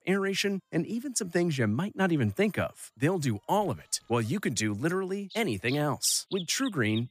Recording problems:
animal sounds; noticeable; throughout; 15 dB below the speech

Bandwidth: 15 kHz